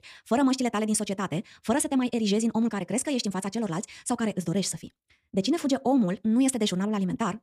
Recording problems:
wrong speed, natural pitch; too fast; 1.7 times normal speed

